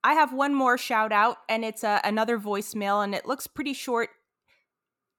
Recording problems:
none

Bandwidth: 18 kHz